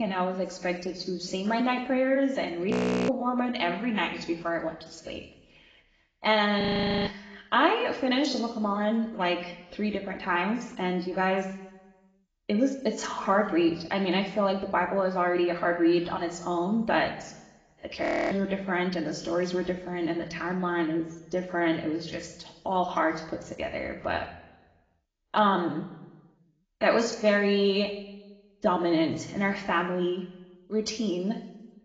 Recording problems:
garbled, watery; badly; nothing above 7.5 kHz
room echo; slight; dies away in 0.9 s
off-mic speech; somewhat distant
abrupt cut into speech; at the start
audio freezing; at 2.5 s, at 6.5 s and at 18 s

